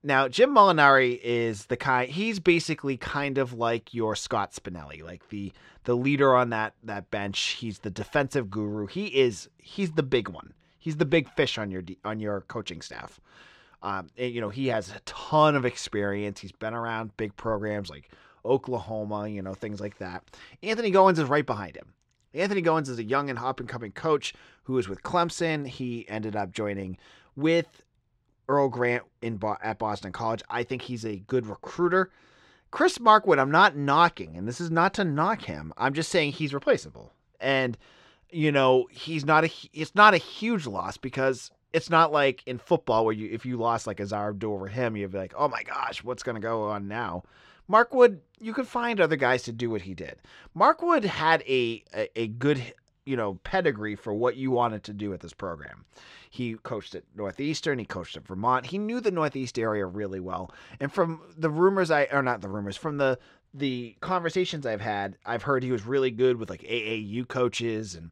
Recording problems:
muffled; slightly; fading above 4 kHz

